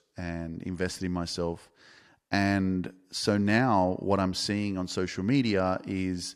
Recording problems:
none

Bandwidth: 13.5 kHz